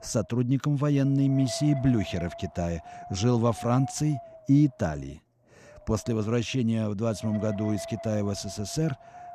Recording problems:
wind noise on the microphone; heavy; 9 dB below the speech

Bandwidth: 14.5 kHz